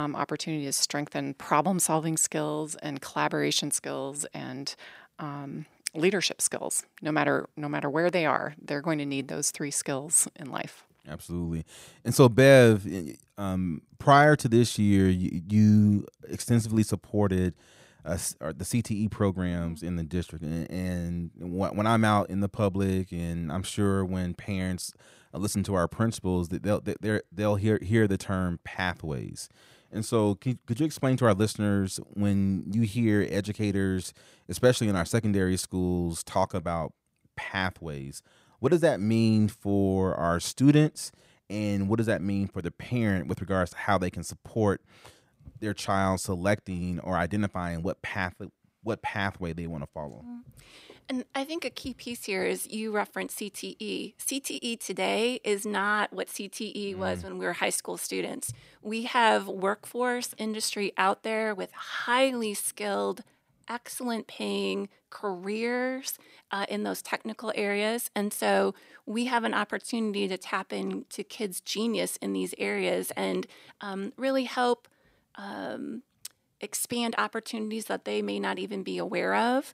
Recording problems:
abrupt cut into speech; at the start

